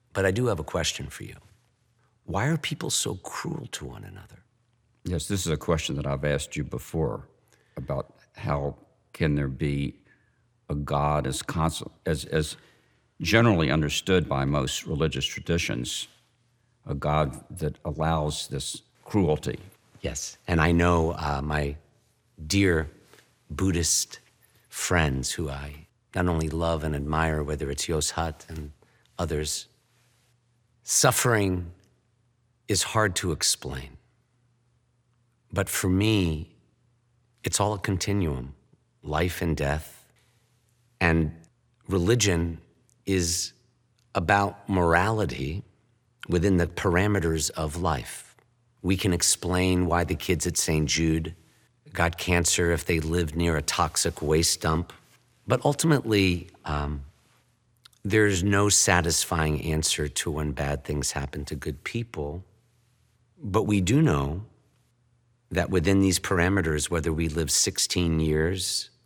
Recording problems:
none

